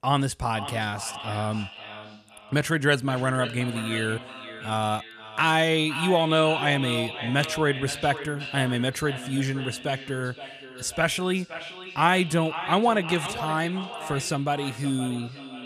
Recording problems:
echo of what is said; strong; throughout; 520 ms later, 10 dB below the speech

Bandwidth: 14.5 kHz